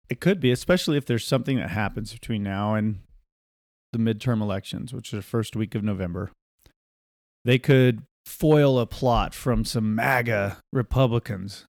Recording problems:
none

